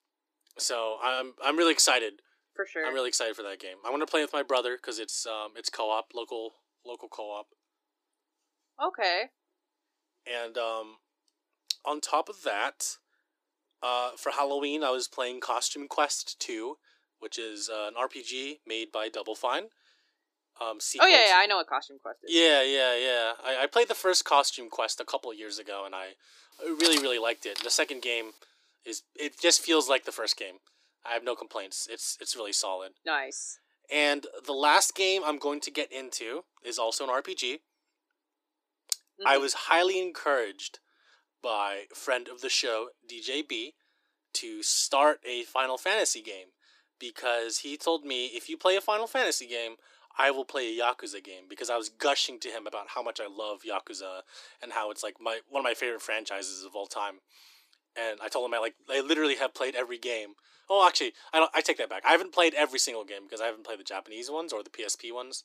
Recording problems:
thin; very; fading below 300 Hz
clattering dishes; loud; at 27 s; peak 2 dB above the speech

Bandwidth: 15 kHz